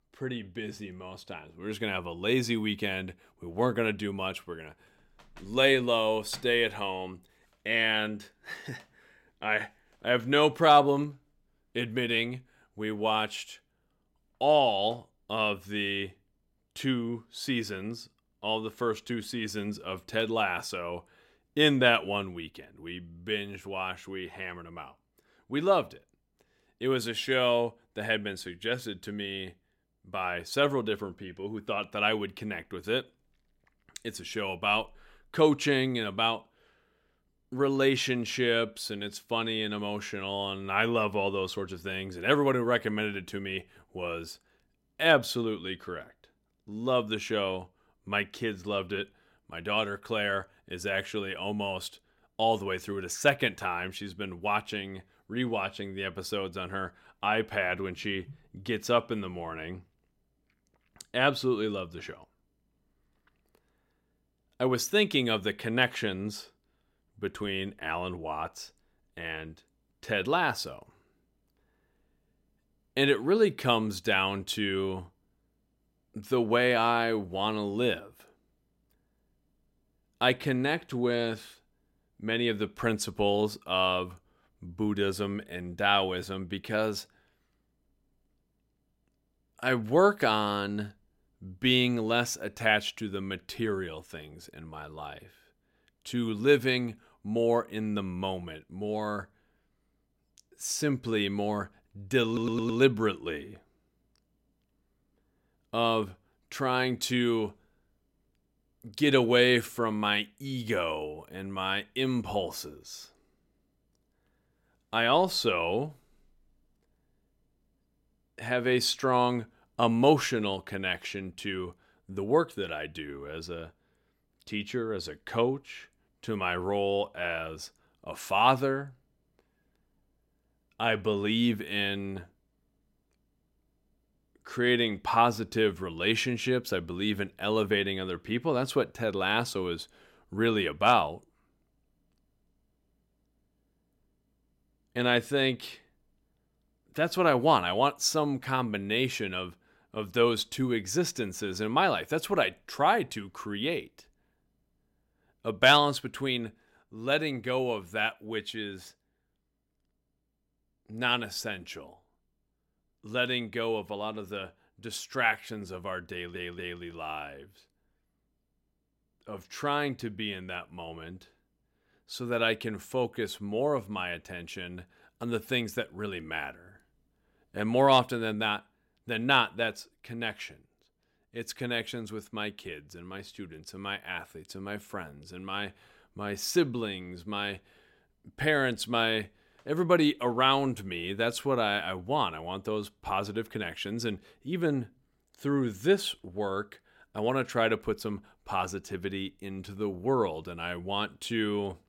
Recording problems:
audio stuttering; at 1:42 and at 2:46

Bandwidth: 16 kHz